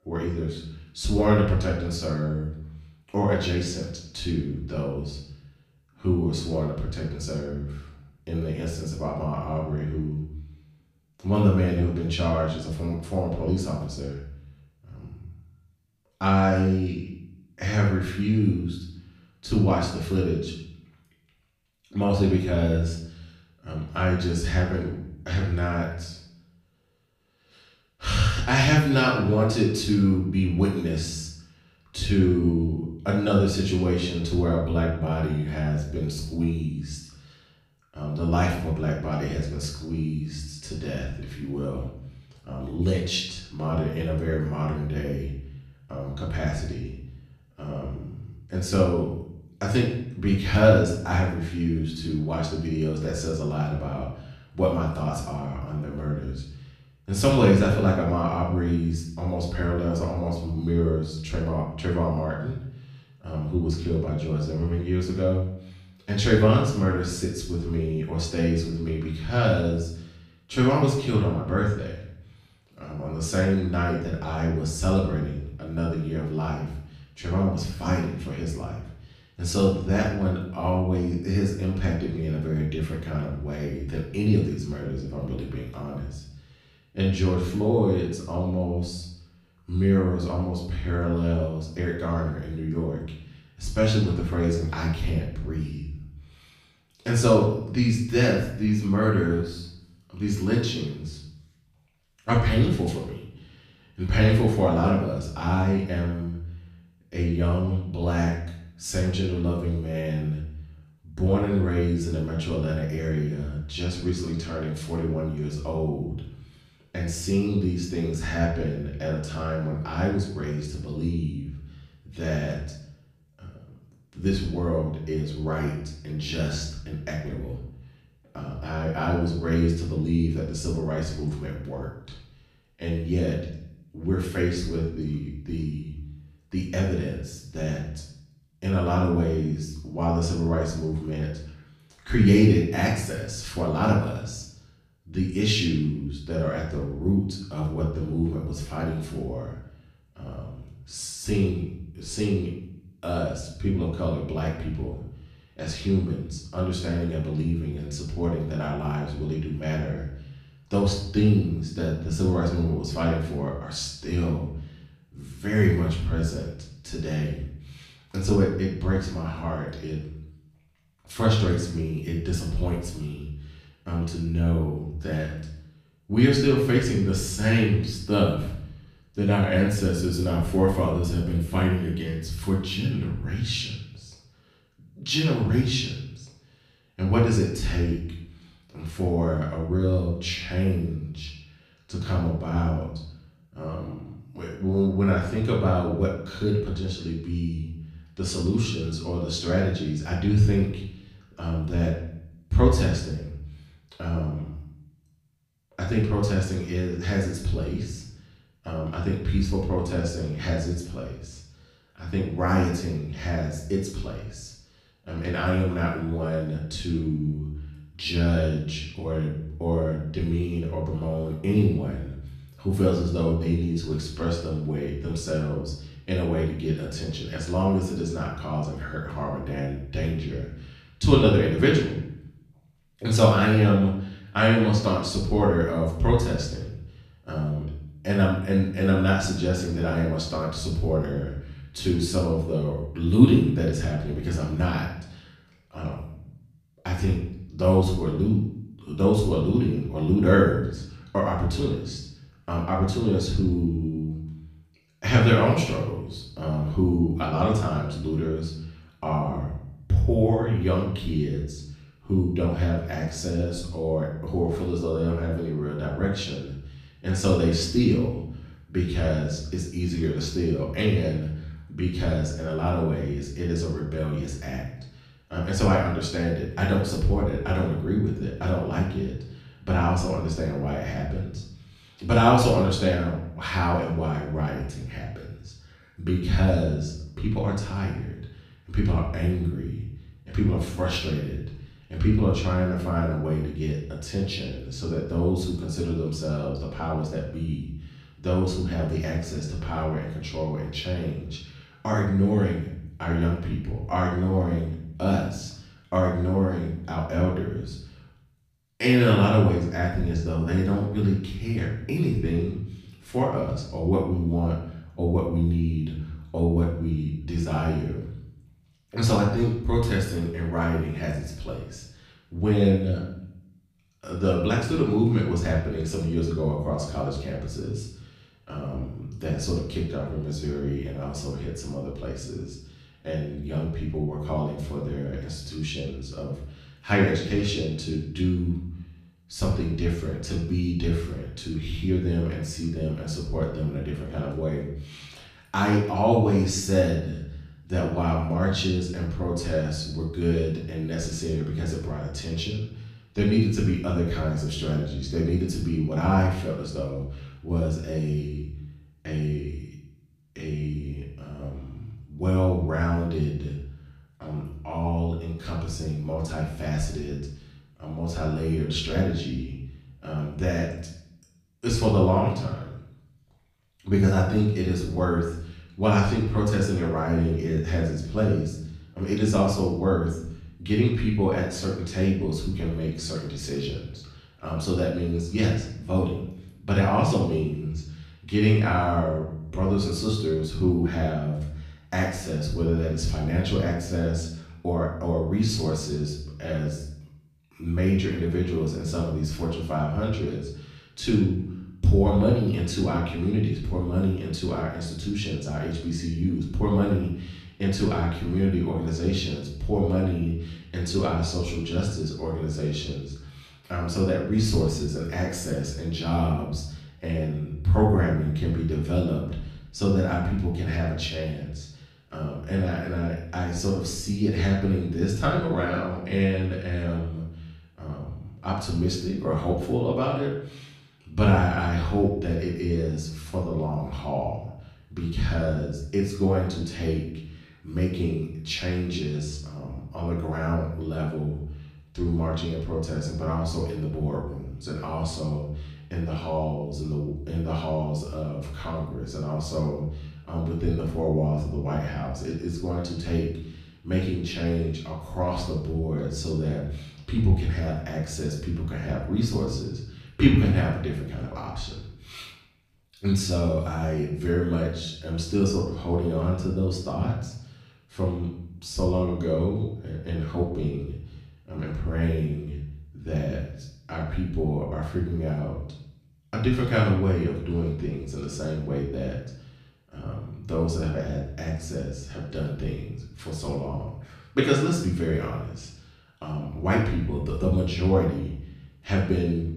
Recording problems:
off-mic speech; far
room echo; noticeable; dies away in 0.6 s

